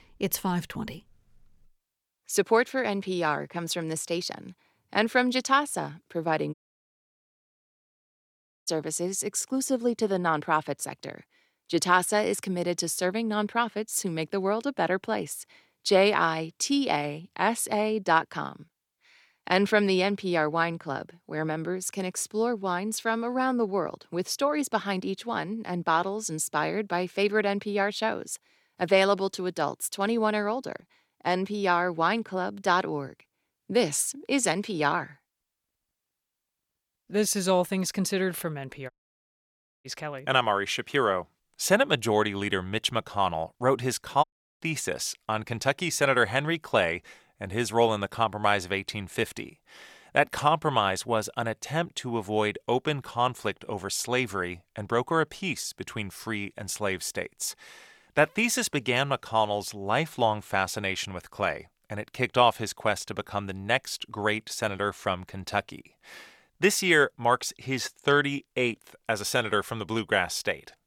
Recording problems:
audio cutting out; at 6.5 s for 2 s, at 39 s for 1 s and at 44 s

